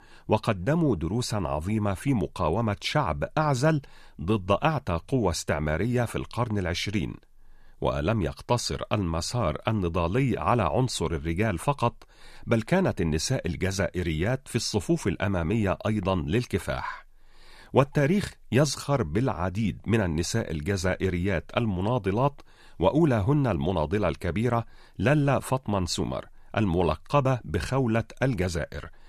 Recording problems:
none

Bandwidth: 14.5 kHz